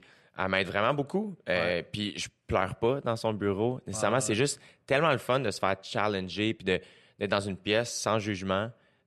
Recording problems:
none

